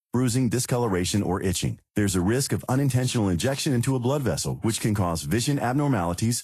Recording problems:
garbled, watery; slightly; nothing above 12.5 kHz

